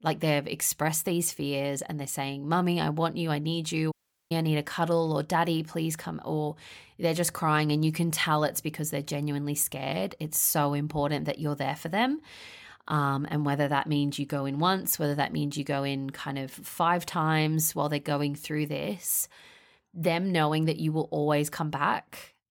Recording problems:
audio cutting out; at 4 s

